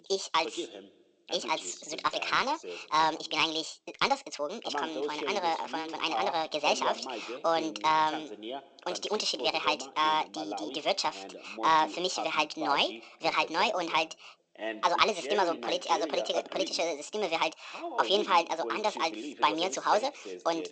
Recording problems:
thin; very; fading below 400 Hz
wrong speed and pitch; too fast and too high; 1.5 times normal speed
garbled, watery; slightly; nothing above 8 kHz
voice in the background; noticeable; throughout; 10 dB below the speech

